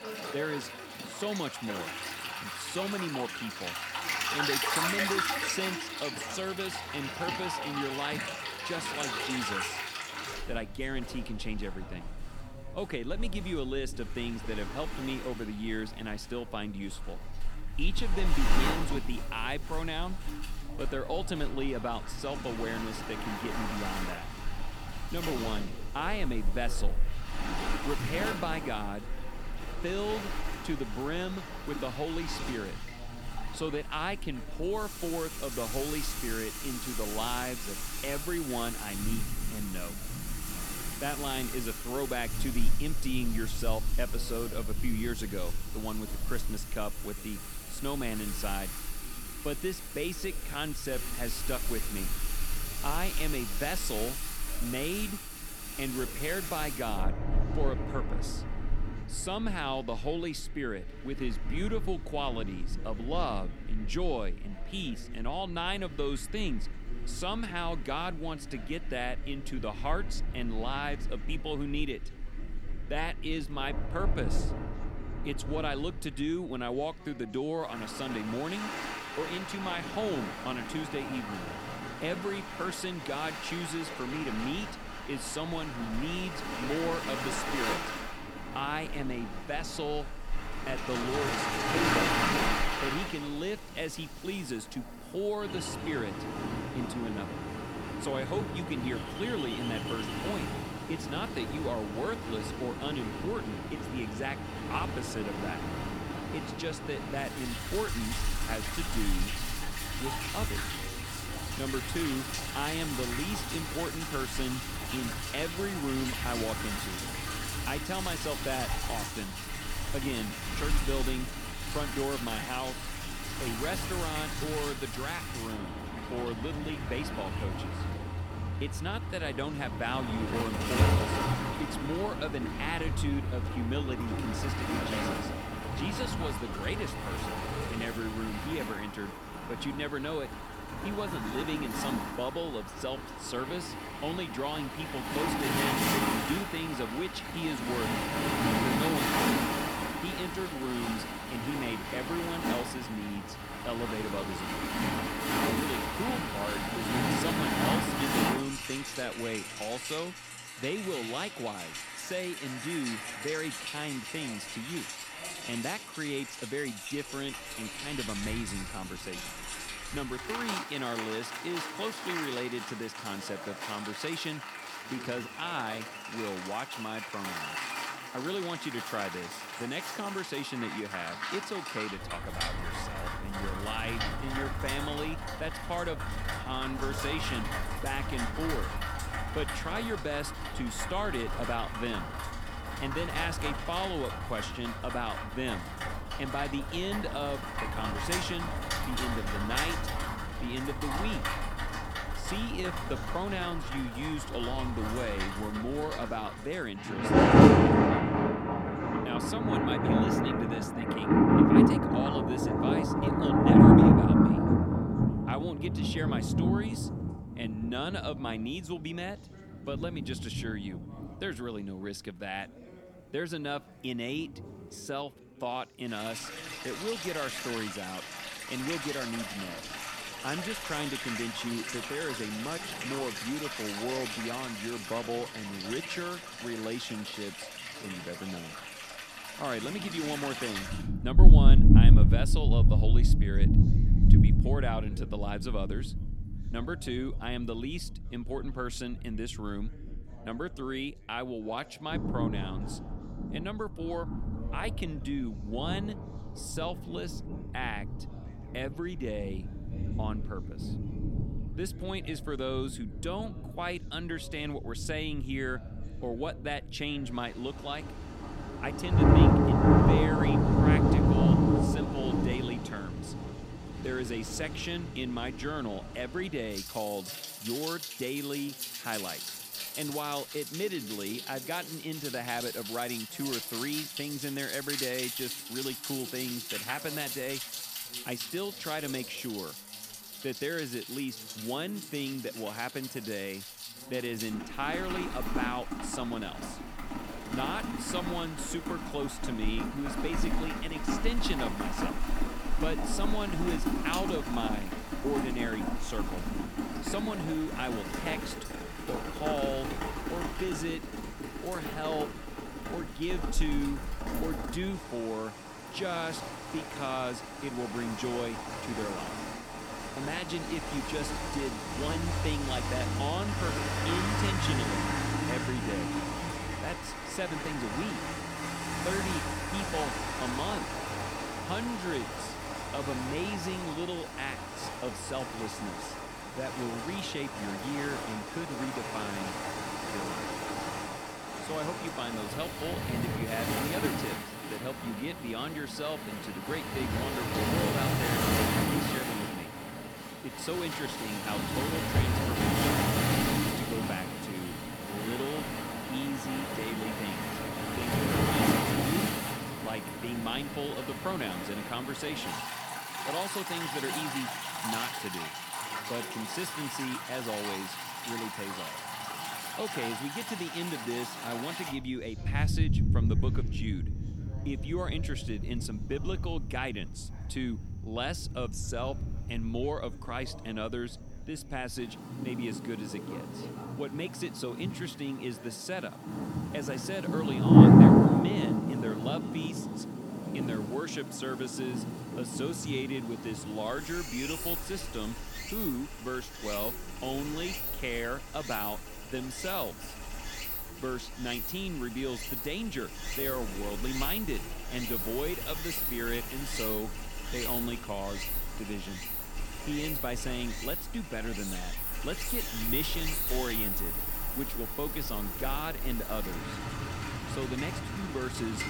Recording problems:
rain or running water; very loud; throughout; 4 dB above the speech
background chatter; noticeable; throughout; 2 voices, 20 dB below the speech

